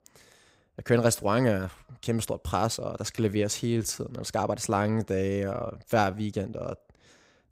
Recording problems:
uneven, jittery; strongly; from 1 to 7 s

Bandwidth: 15.5 kHz